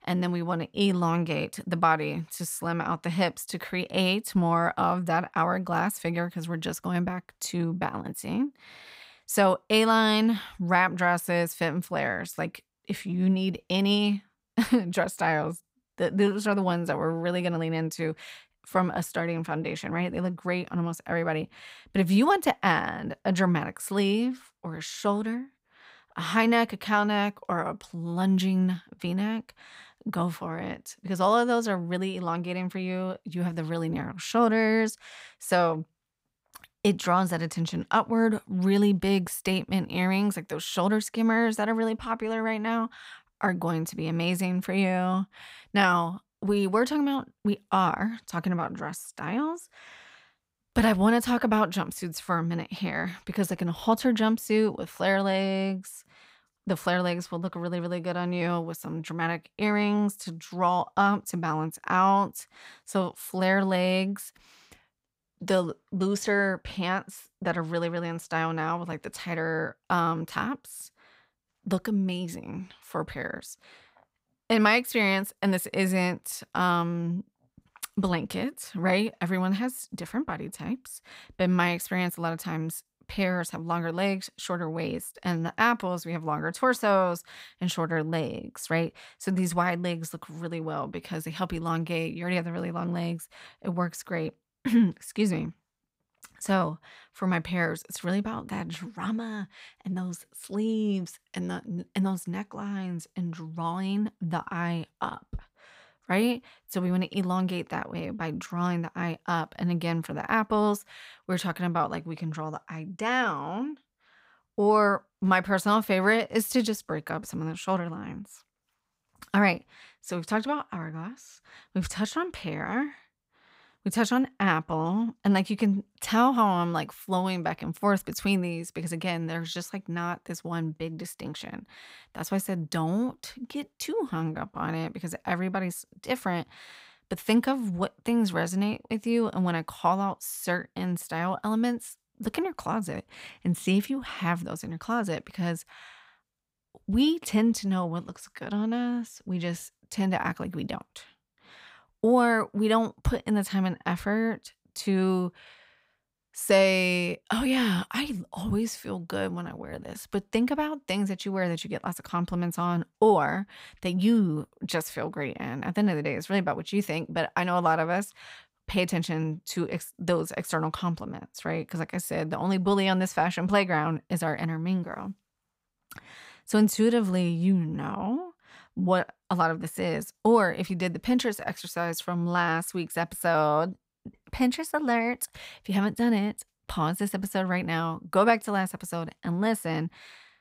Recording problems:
none

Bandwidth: 15.5 kHz